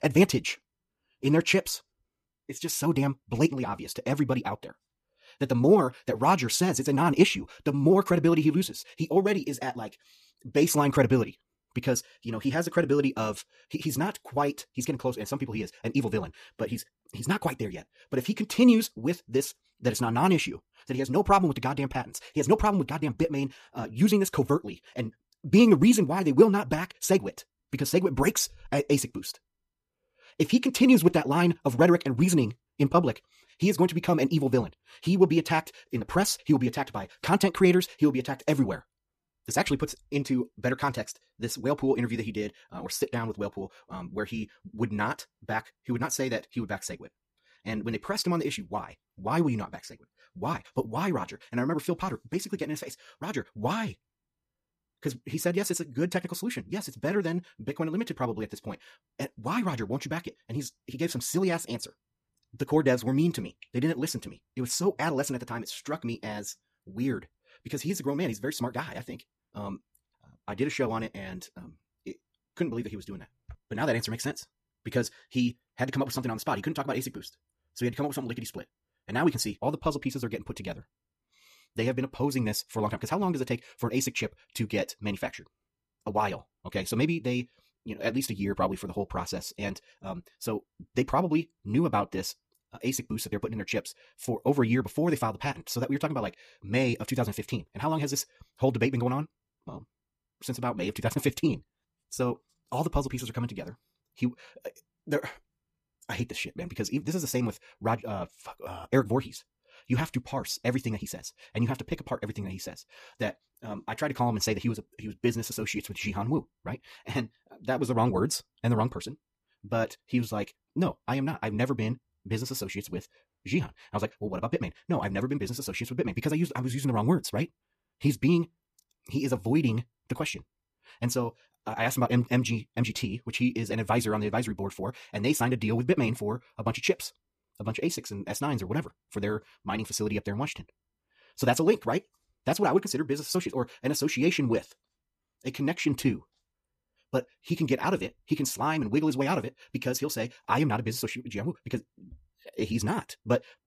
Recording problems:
wrong speed, natural pitch; too fast; 1.6 times normal speed

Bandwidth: 14.5 kHz